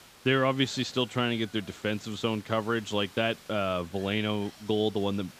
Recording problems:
high frequencies cut off; noticeable; nothing above 8 kHz
hiss; faint; throughout; 20 dB below the speech

